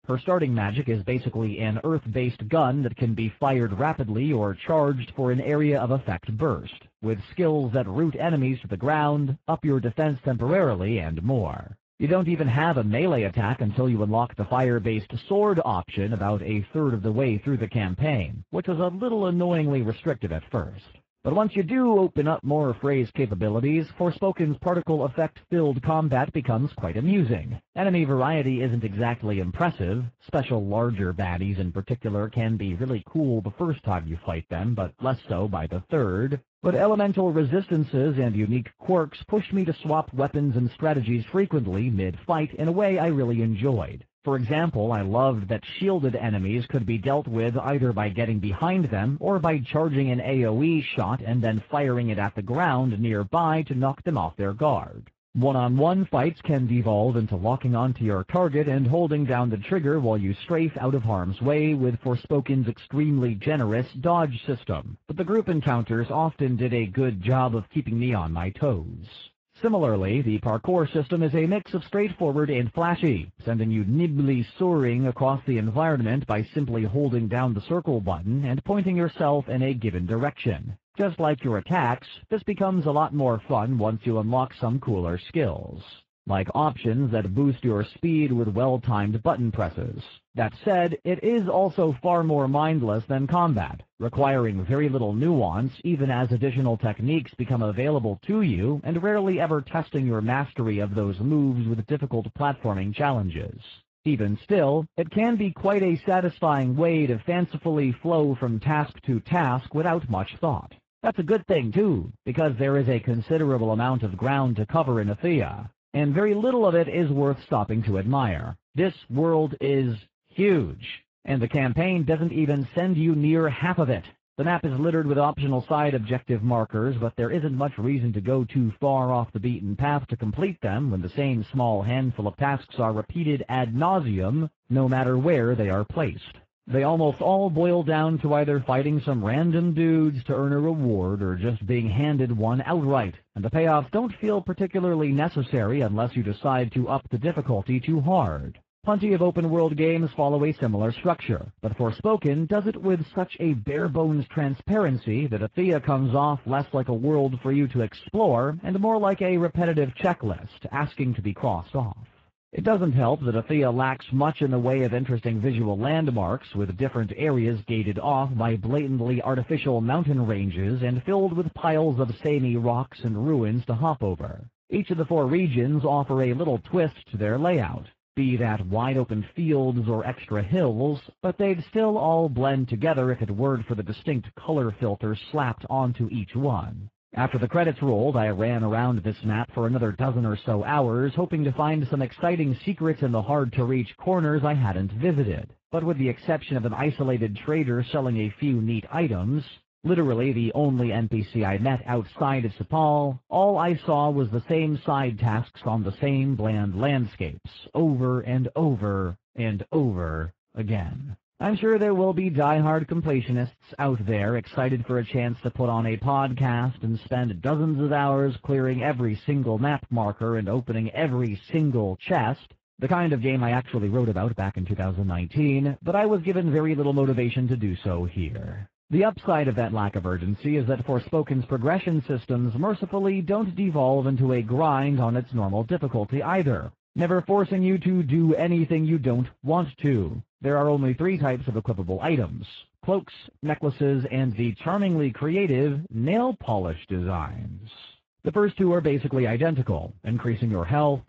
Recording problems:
garbled, watery; badly
muffled; very; fading above 3 kHz

